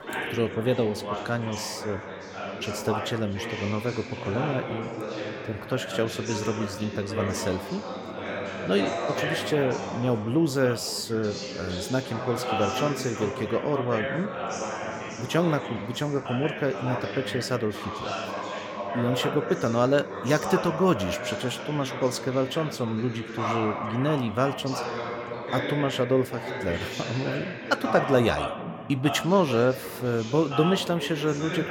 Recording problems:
background chatter; loud; throughout; 4 voices, 5 dB below the speech

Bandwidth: 17.5 kHz